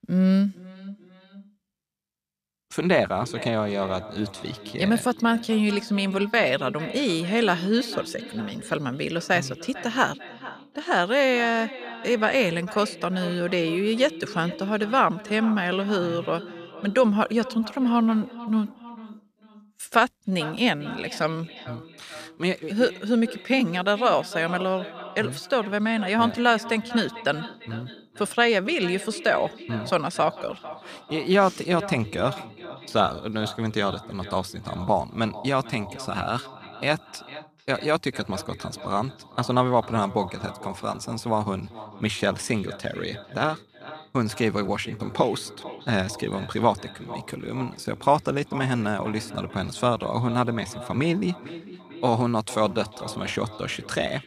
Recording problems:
echo of what is said; noticeable; throughout; 450 ms later, 15 dB below the speech

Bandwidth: 14.5 kHz